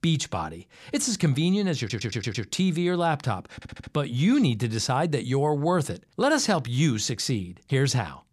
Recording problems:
audio stuttering; at 2 s and at 3.5 s

